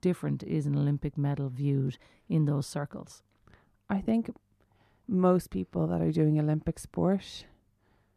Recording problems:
muffled; slightly; fading above 2 kHz

